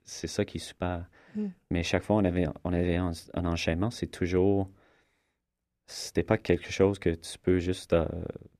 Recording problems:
muffled; slightly; fading above 3 kHz

